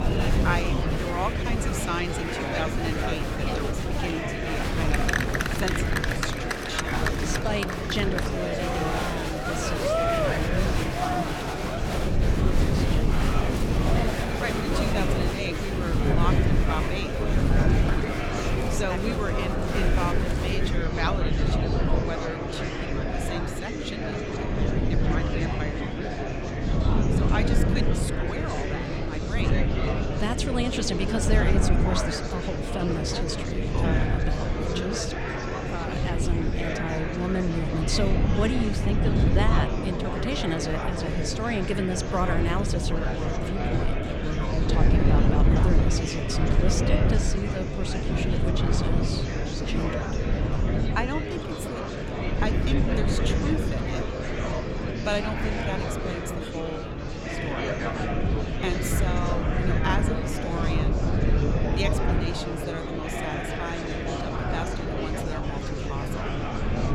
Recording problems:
murmuring crowd; very loud; throughout; 2 dB above the speech
wind noise on the microphone; heavy; 5 dB below the speech

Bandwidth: 18 kHz